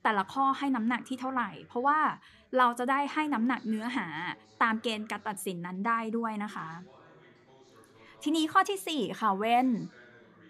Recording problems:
background chatter; faint; throughout; 2 voices, 30 dB below the speech

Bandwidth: 15.5 kHz